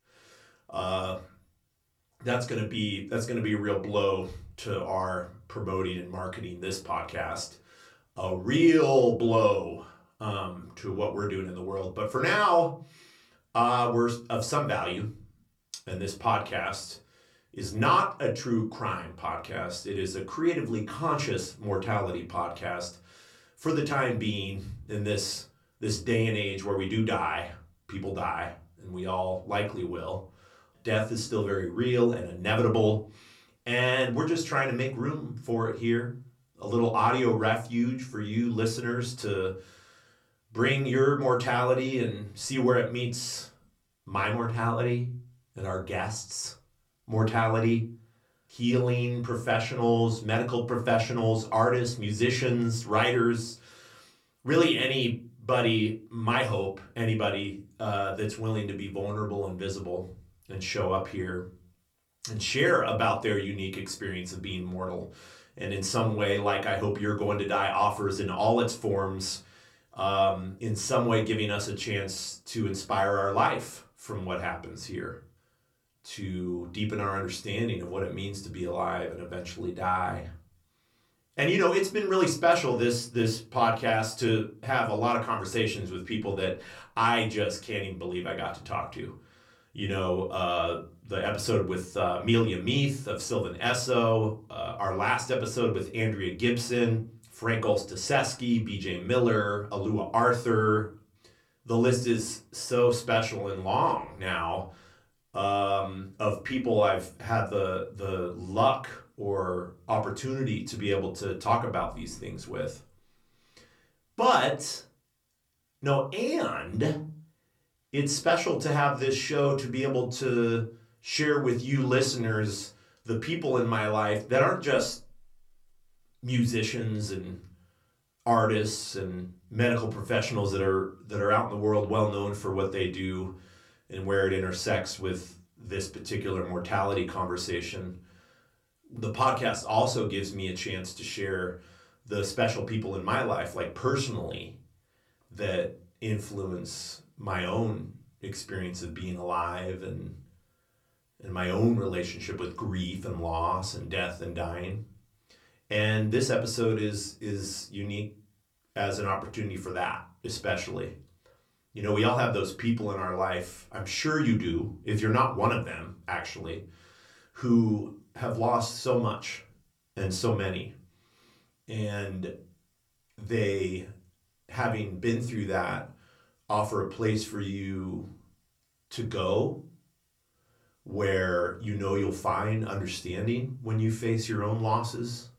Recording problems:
off-mic speech; far
room echo; very slight; dies away in 0.3 s

